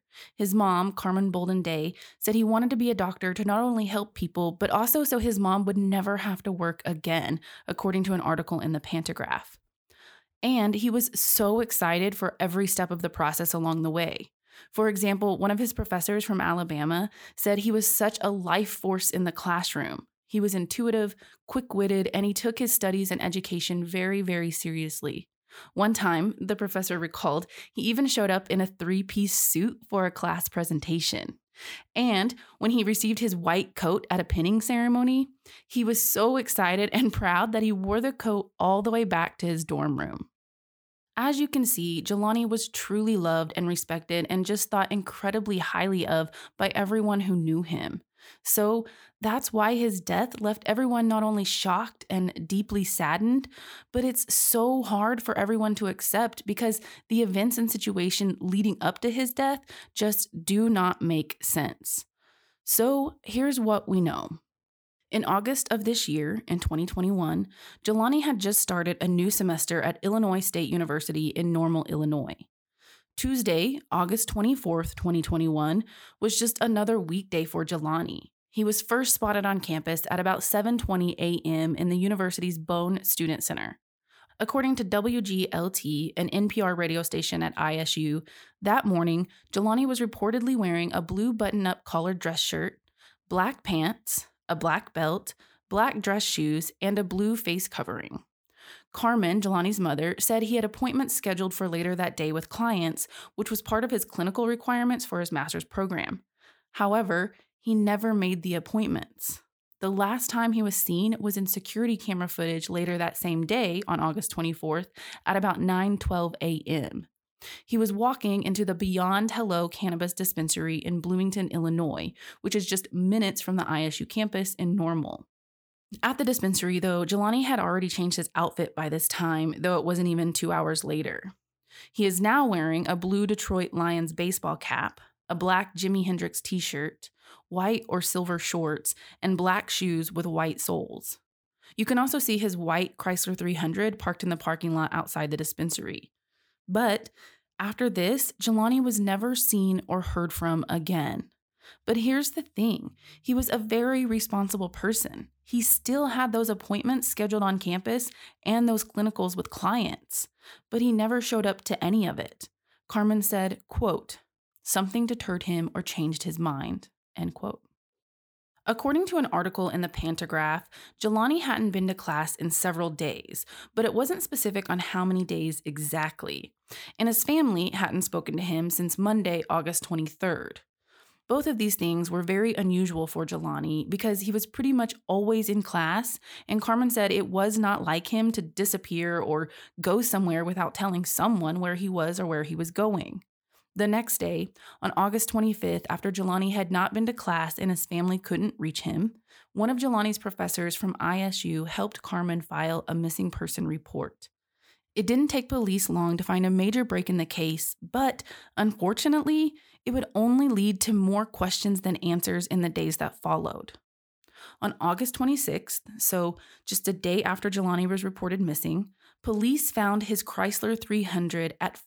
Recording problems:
none

